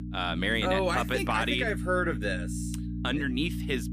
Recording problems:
electrical hum; noticeable; throughout; 60 Hz, 15 dB below the speech

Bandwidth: 15 kHz